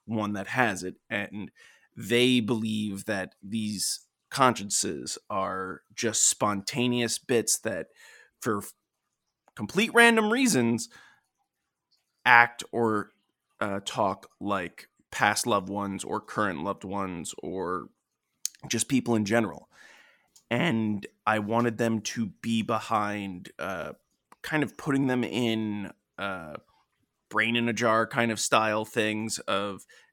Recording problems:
none

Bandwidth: 18 kHz